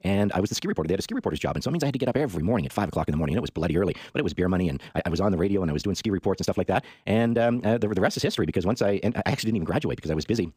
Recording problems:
wrong speed, natural pitch; too fast; 1.5 times normal speed

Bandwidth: 15 kHz